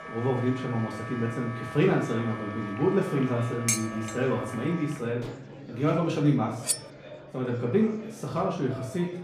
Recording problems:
off-mic speech; far
room echo; slight; dies away in 0.4 s
background music; noticeable; throughout; 15 dB below the speech
murmuring crowd; noticeable; throughout; 20 dB below the speech
clattering dishes; loud; at 3.5 s; peak level with the speech
clattering dishes; faint; at 5 s; peak 15 dB below the speech
clattering dishes; noticeable; at 6.5 s; peak 1 dB below the speech

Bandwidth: 15 kHz